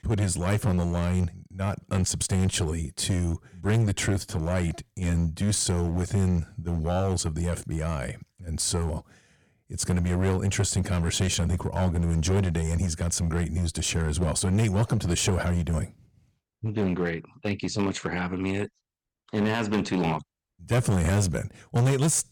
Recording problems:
distortion; slight; 8% of the sound clipped

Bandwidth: 18.5 kHz